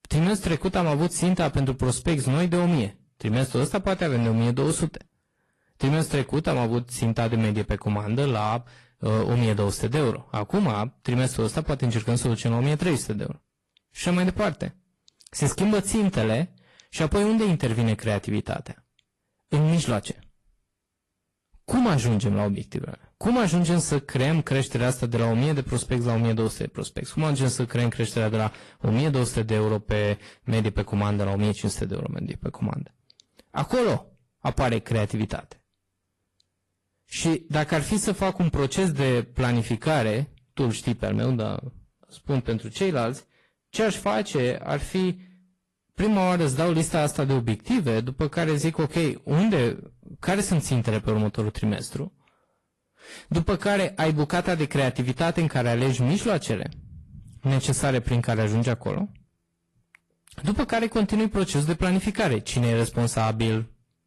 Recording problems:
distortion; slight; 11% of the sound clipped
garbled, watery; slightly; nothing above 11 kHz

